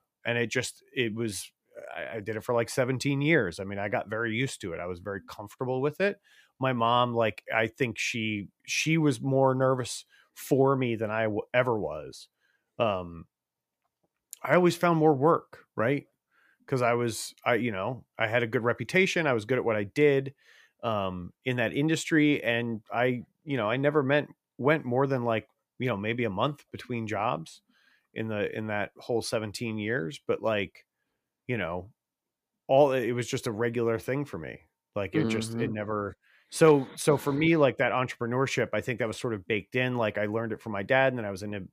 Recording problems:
none

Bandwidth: 15 kHz